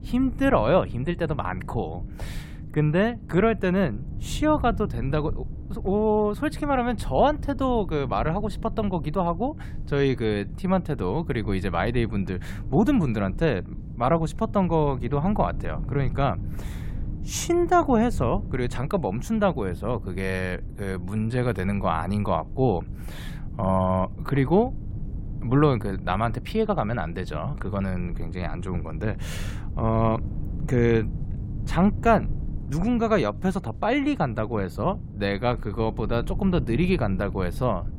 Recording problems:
low rumble; faint; throughout; 20 dB below the speech

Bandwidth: 16 kHz